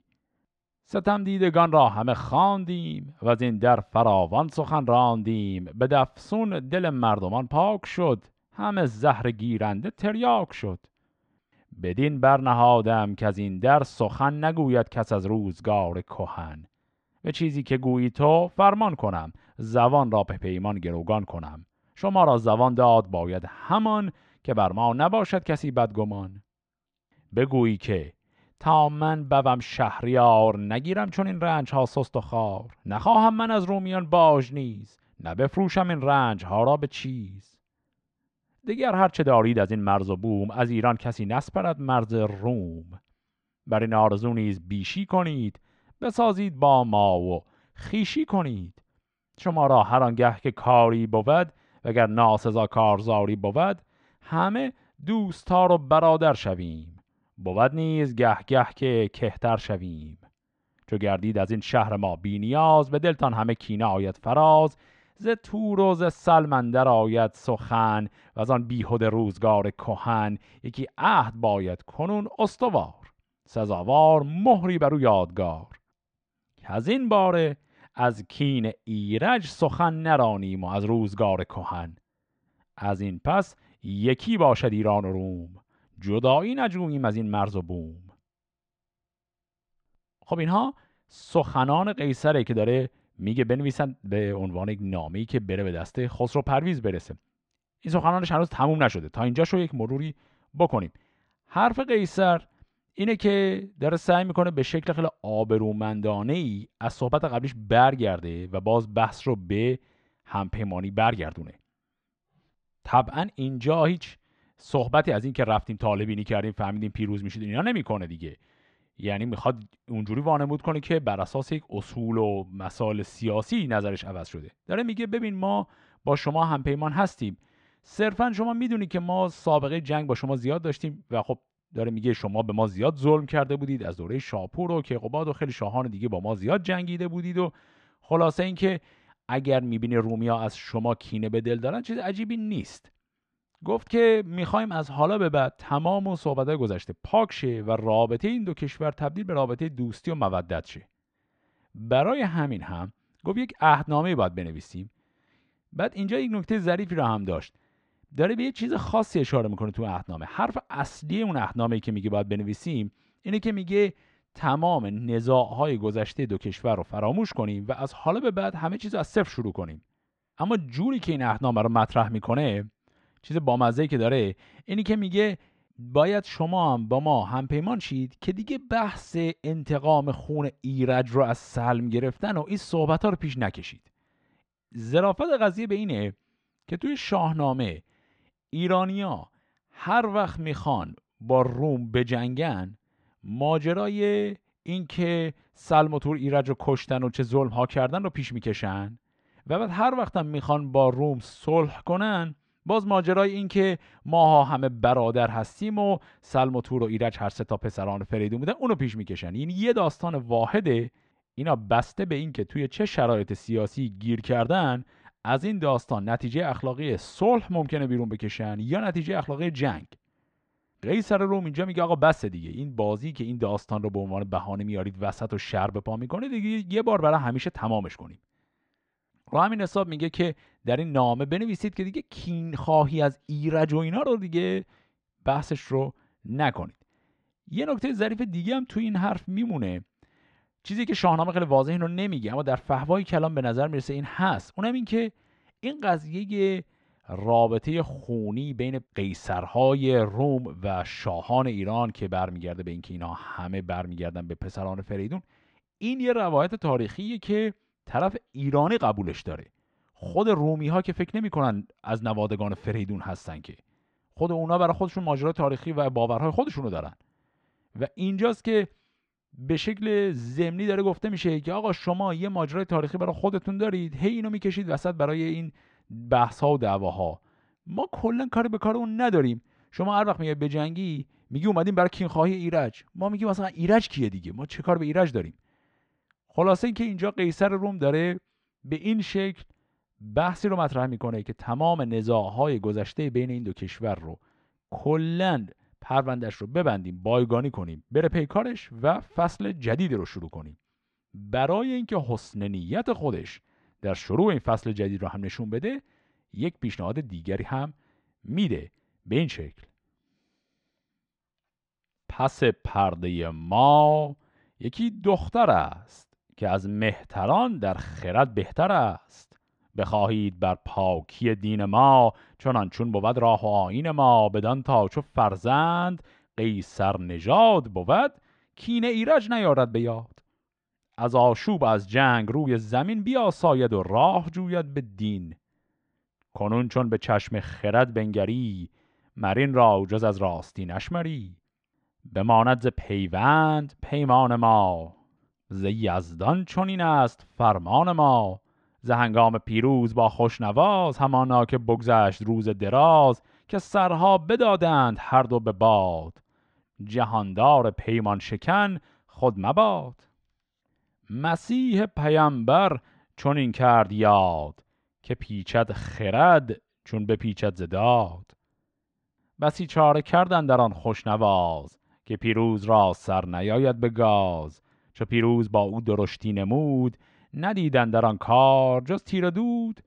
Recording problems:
muffled; slightly; fading above 3.5 kHz

